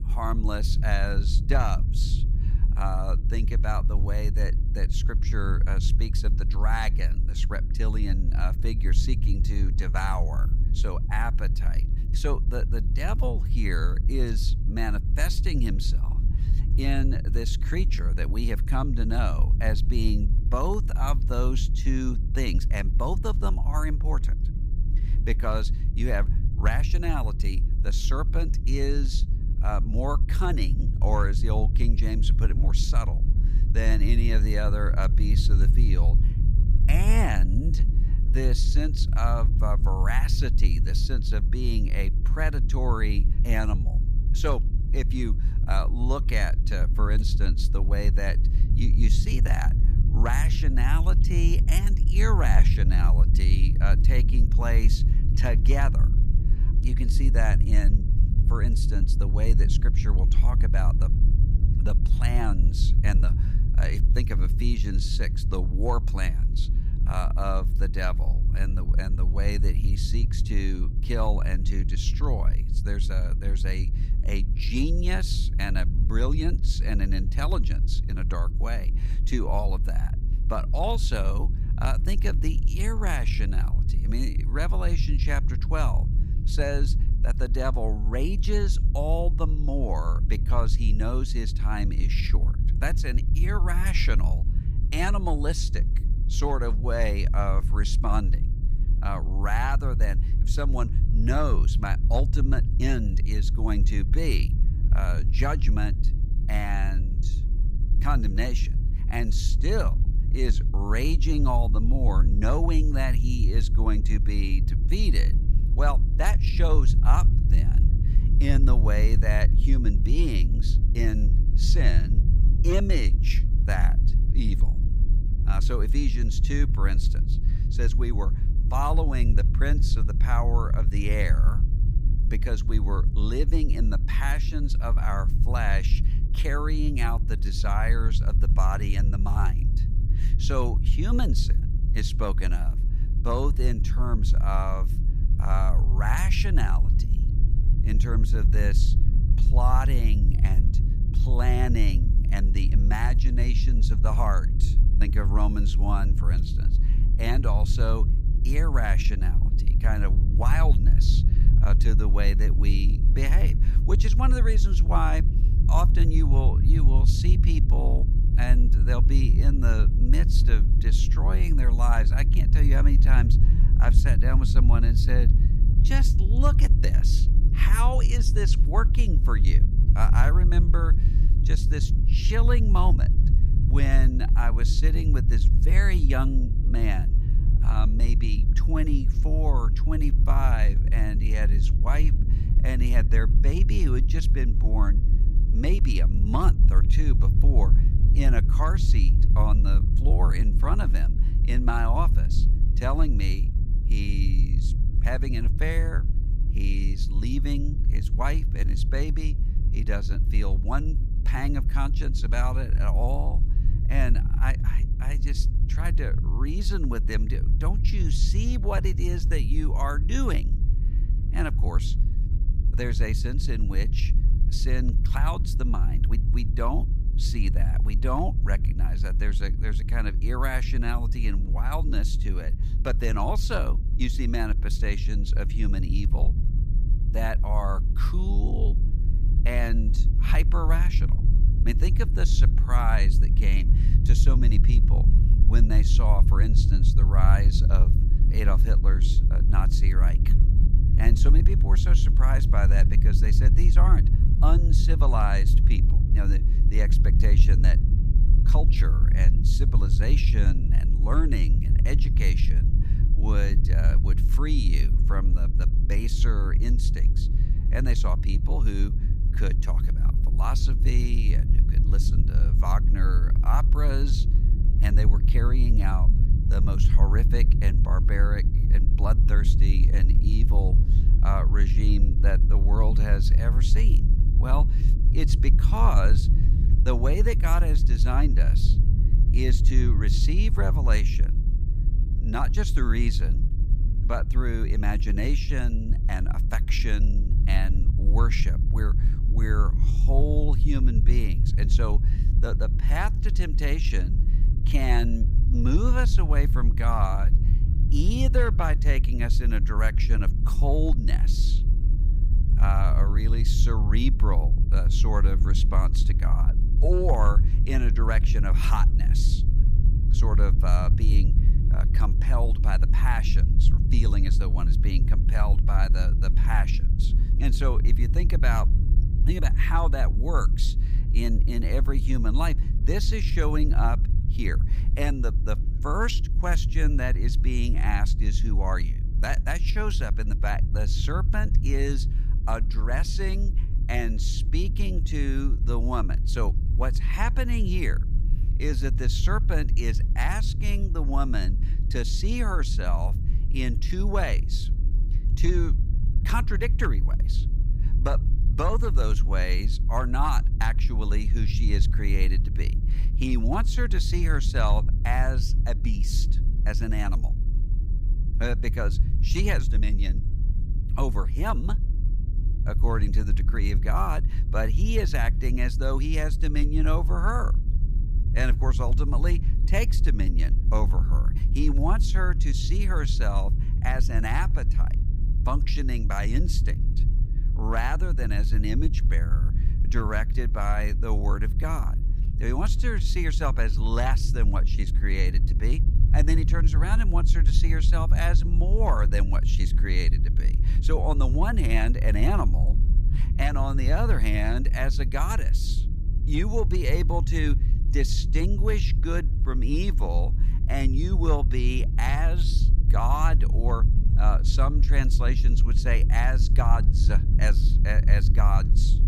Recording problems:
low rumble; loud; throughout; 9 dB below the speech

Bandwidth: 15.5 kHz